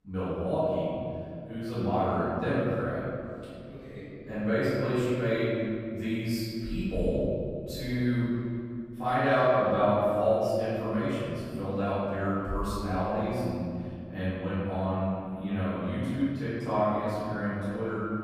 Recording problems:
room echo; strong; dies away in 2.3 s
off-mic speech; far

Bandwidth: 14.5 kHz